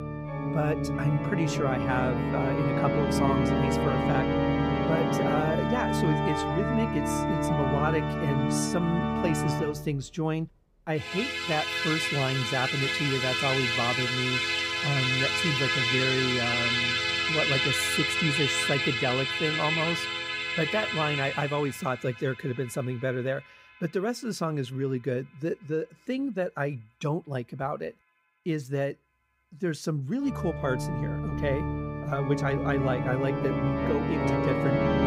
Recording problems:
background music; very loud; throughout; 3 dB above the speech

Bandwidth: 15.5 kHz